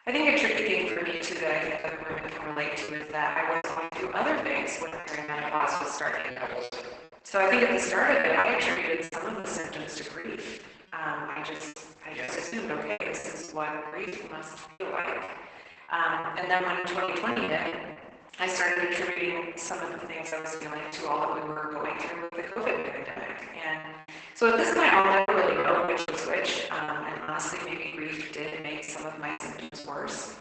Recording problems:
off-mic speech; far
garbled, watery; badly; nothing above 8 kHz
thin; very; fading below 500 Hz
room echo; noticeable; dies away in 1.1 s
choppy; very; 12% of the speech affected

